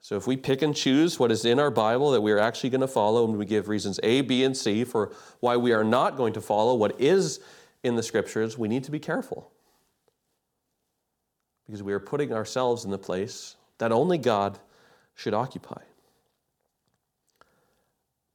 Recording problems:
none

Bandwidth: 18.5 kHz